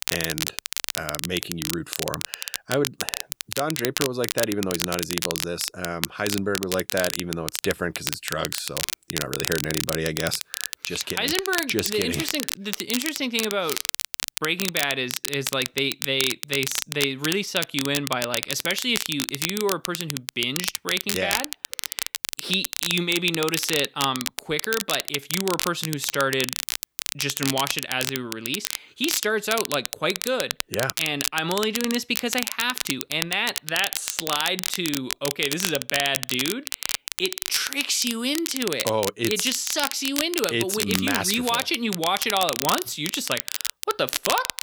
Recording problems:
crackle, like an old record; loud; 3 dB below the speech

